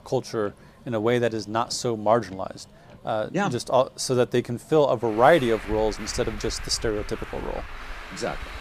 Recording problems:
traffic noise; noticeable; throughout; 15 dB below the speech

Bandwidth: 15 kHz